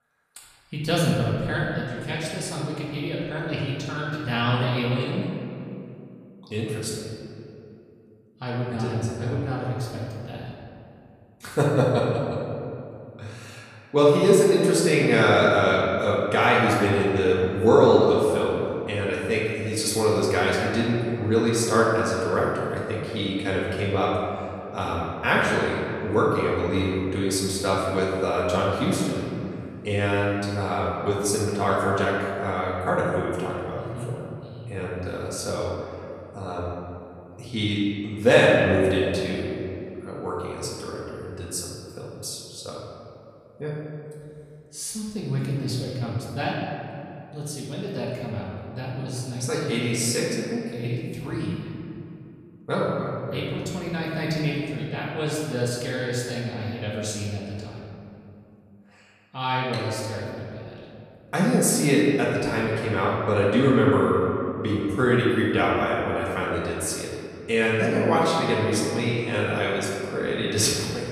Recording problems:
off-mic speech; far
room echo; noticeable; dies away in 2.4 s

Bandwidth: 14.5 kHz